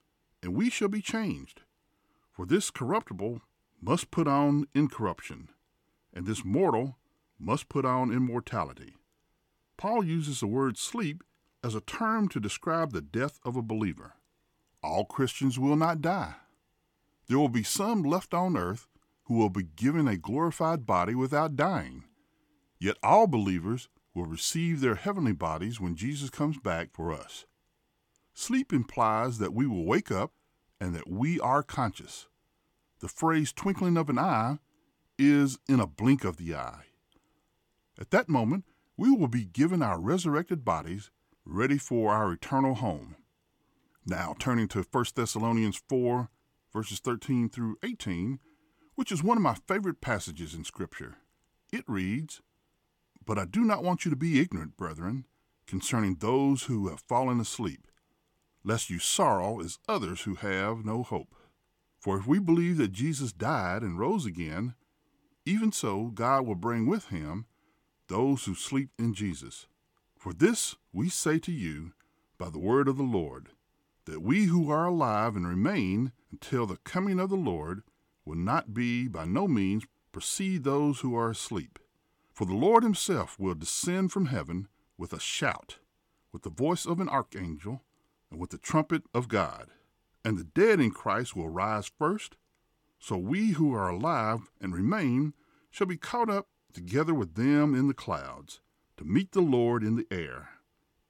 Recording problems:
none

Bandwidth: 17.5 kHz